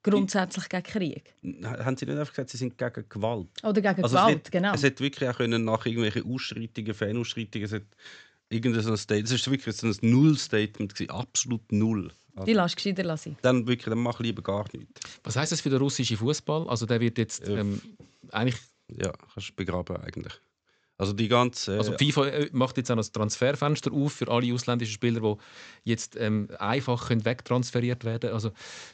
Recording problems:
high frequencies cut off; noticeable; nothing above 8 kHz

